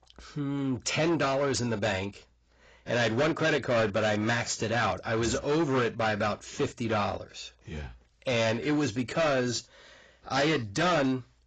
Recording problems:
distortion; heavy; 13% of the sound clipped
garbled, watery; badly; nothing above 7.5 kHz

